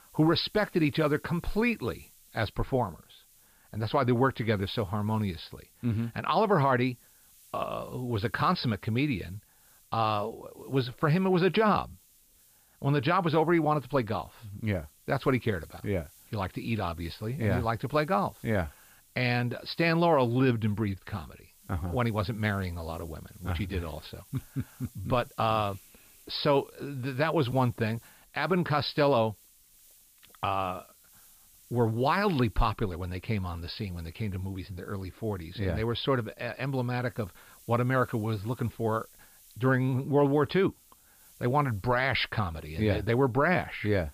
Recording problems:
high frequencies cut off; noticeable; nothing above 5.5 kHz
hiss; faint; throughout; 25 dB below the speech

